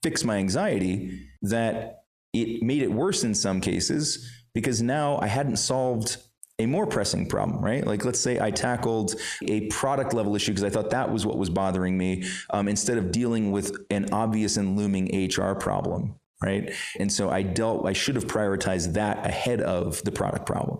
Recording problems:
squashed, flat; heavily

